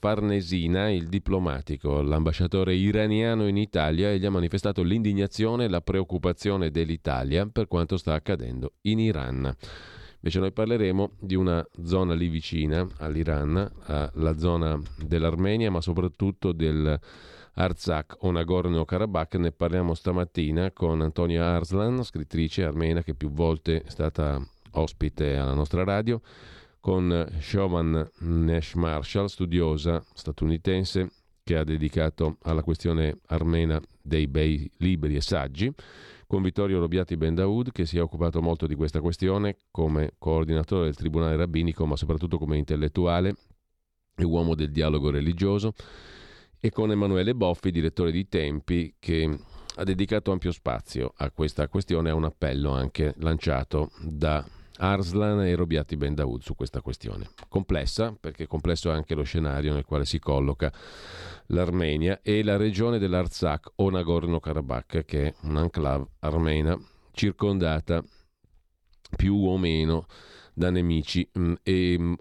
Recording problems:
none

